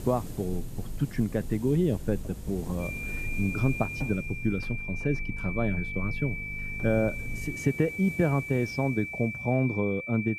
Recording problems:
muffled; slightly; fading above 2.5 kHz
high-pitched whine; loud; from 3 s on; 2.5 kHz, 6 dB below the speech
electrical hum; noticeable; until 7.5 s; 50 Hz, 20 dB below the speech
hiss; noticeable; throughout; 15 dB below the speech

